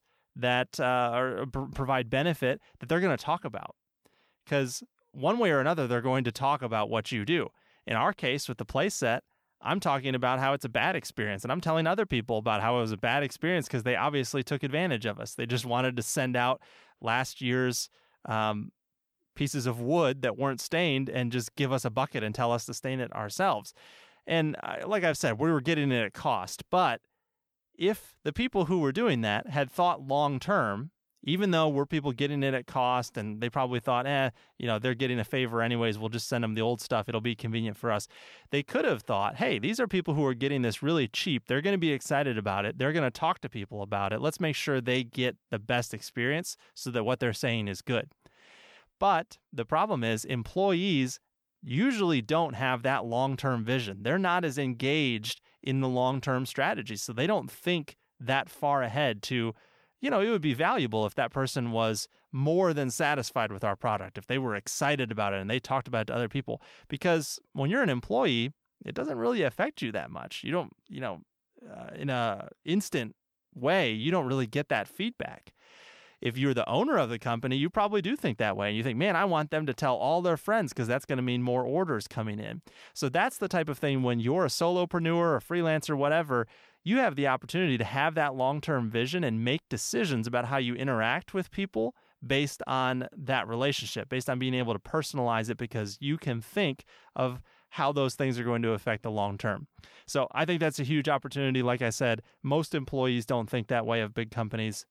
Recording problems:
none

